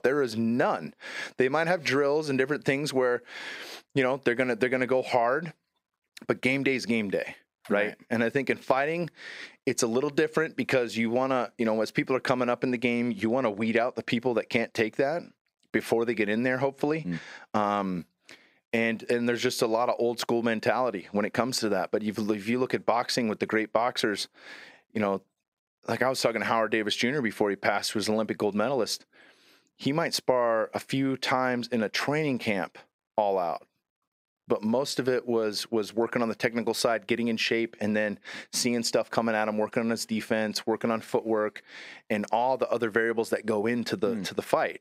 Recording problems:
squashed, flat; somewhat

